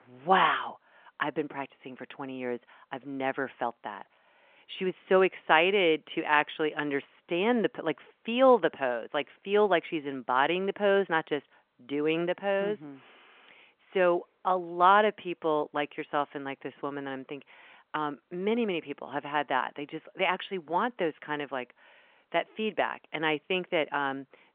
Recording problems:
phone-call audio; nothing above 3.5 kHz

